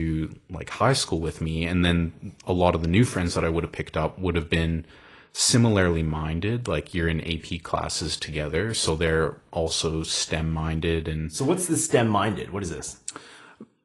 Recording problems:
garbled, watery; slightly; nothing above 10.5 kHz
abrupt cut into speech; at the start

